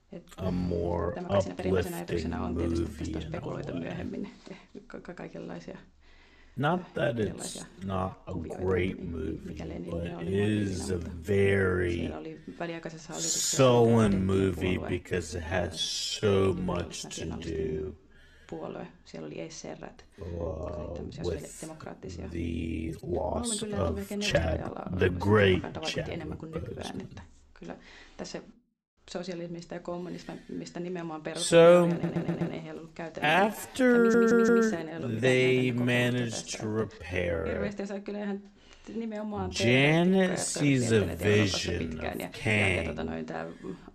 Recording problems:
wrong speed, natural pitch; too slow; 0.5 times normal speed
voice in the background; noticeable; throughout; 10 dB below the speech
uneven, jittery; strongly; from 1 to 43 s
audio stuttering; at 32 s and at 34 s

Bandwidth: 13.5 kHz